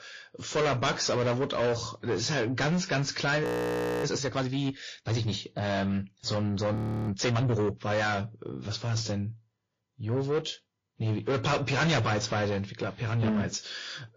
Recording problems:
distortion; heavy; 6 dB below the speech
garbled, watery; slightly; nothing above 15 kHz
audio freezing; at 3.5 s for 0.5 s and at 7 s

